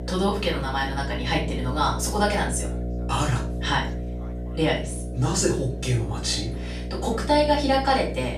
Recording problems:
off-mic speech; far
room echo; slight; dies away in 0.3 s
electrical hum; noticeable; throughout; 60 Hz, 15 dB below the speech
background chatter; faint; throughout; 3 voices, 20 dB below the speech

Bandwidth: 14.5 kHz